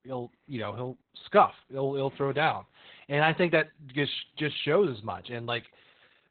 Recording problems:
garbled, watery; badly; nothing above 4 kHz

